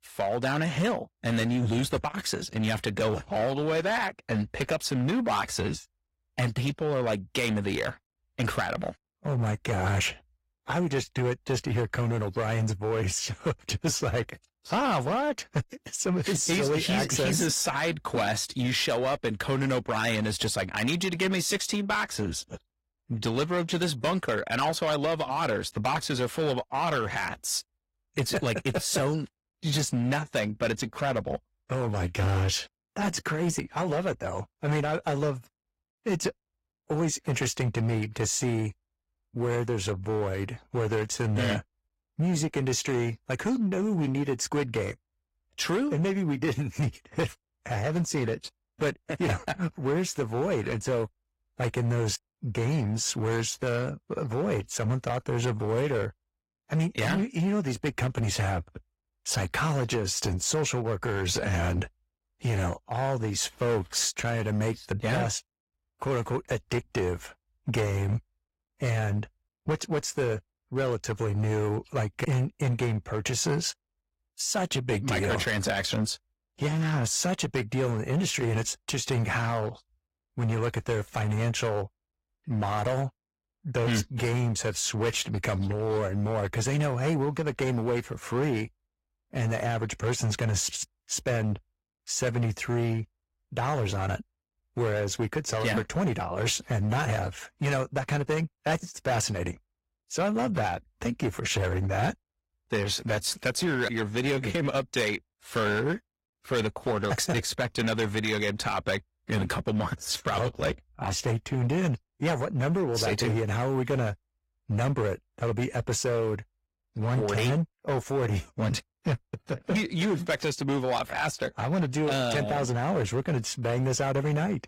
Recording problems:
distortion; slight; 8% of the sound clipped
garbled, watery; slightly; nothing above 17 kHz

